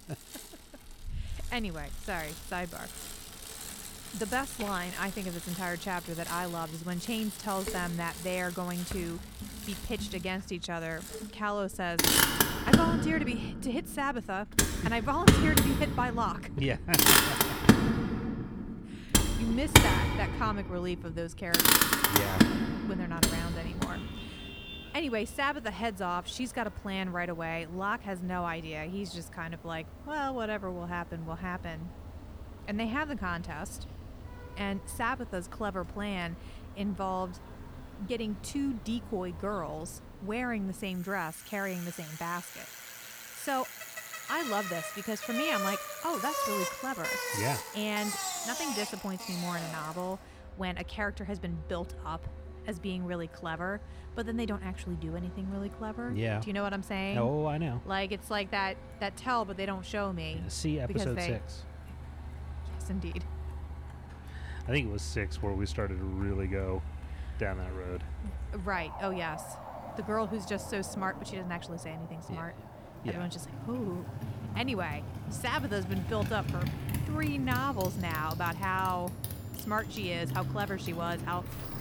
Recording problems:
traffic noise; very loud; throughout; 3 dB above the speech

